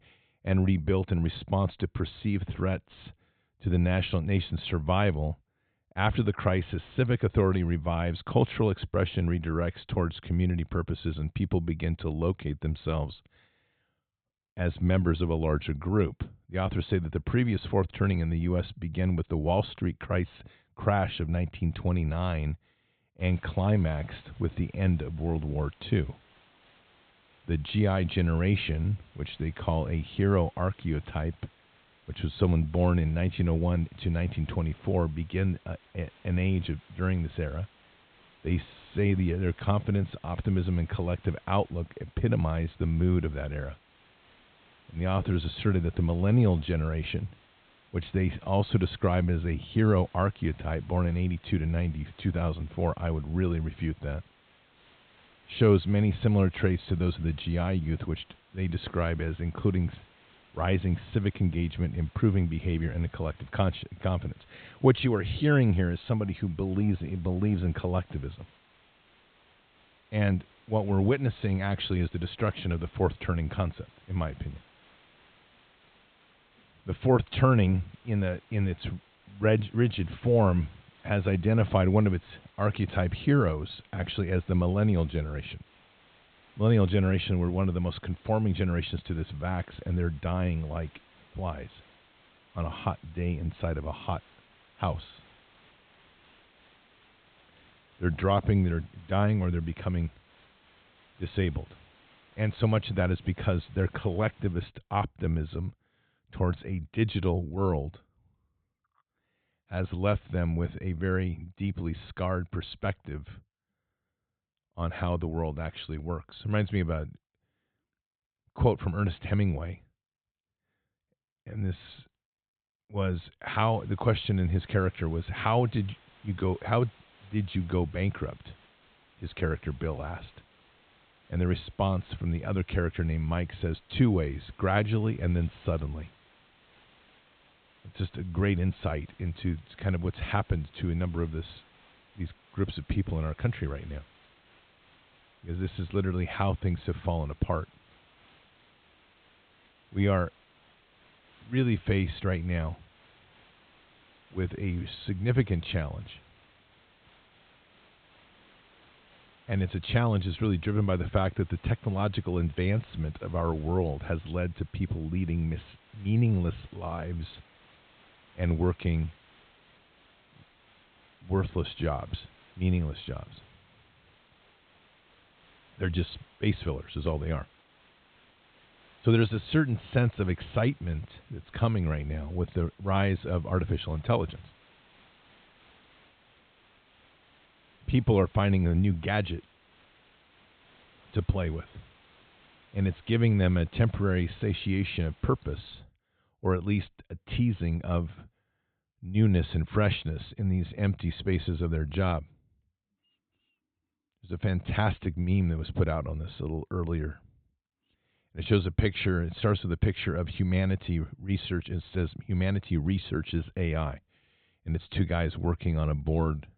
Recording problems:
high frequencies cut off; severe; nothing above 4 kHz
hiss; faint; from 23 s to 1:45 and from 2:04 to 3:16; 30 dB below the speech

